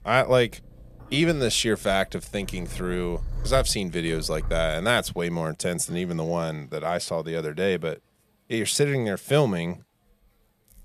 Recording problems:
animal sounds; noticeable; throughout; 15 dB below the speech

